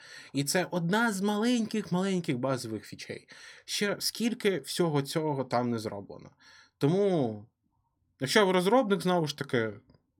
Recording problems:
none

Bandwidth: 17 kHz